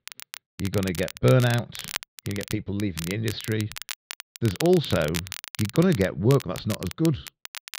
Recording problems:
muffled; slightly; fading above 4 kHz
crackle, like an old record; noticeable; 10 dB below the speech

